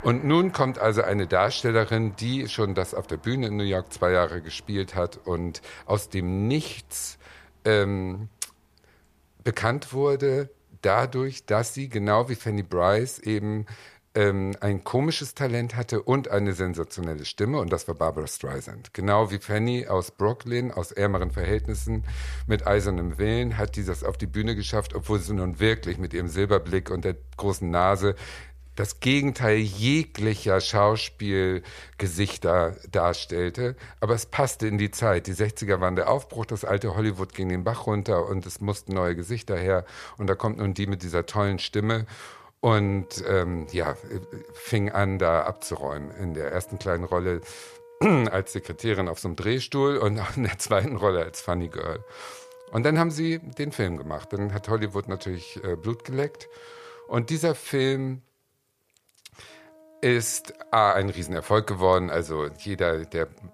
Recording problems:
background music; noticeable; throughout; 20 dB below the speech

